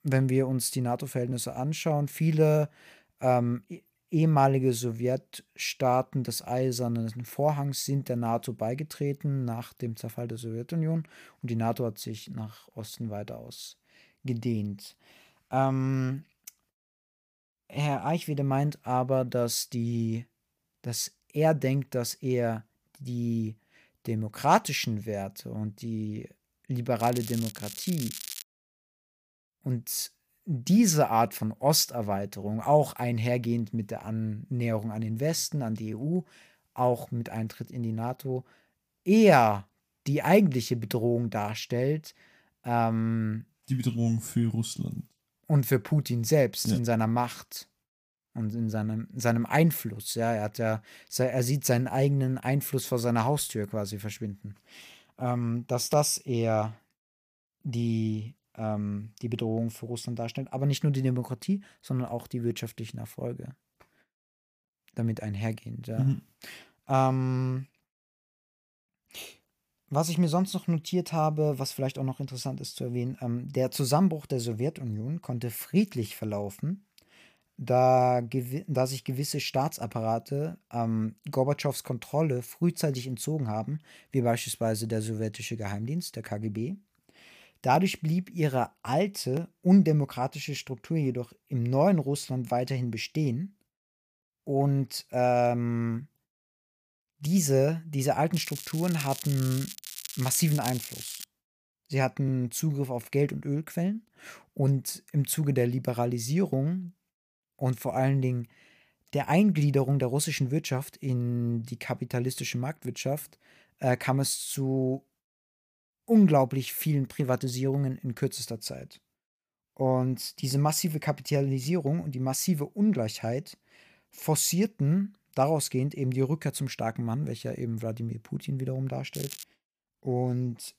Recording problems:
crackling; noticeable; from 27 to 28 s, from 1:38 to 1:41 and at 2:09; 10 dB below the speech

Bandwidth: 15 kHz